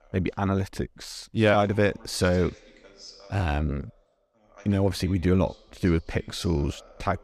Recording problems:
voice in the background; faint; throughout; 25 dB below the speech

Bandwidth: 14.5 kHz